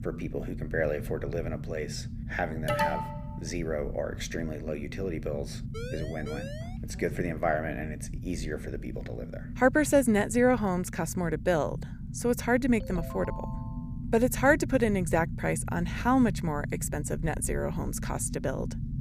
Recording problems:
low rumble; noticeable; throughout; 20 dB below the speech
alarm; loud; at 2.5 s; peak 1 dB above the speech
siren; faint; from 5.5 to 7 s; peak 10 dB below the speech
phone ringing; faint; from 13 to 14 s; peak 15 dB below the speech

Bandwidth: 15 kHz